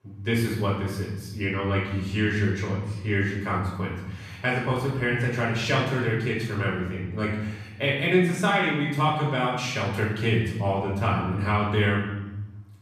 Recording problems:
off-mic speech; far
room echo; noticeable; dies away in 1 s

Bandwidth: 14.5 kHz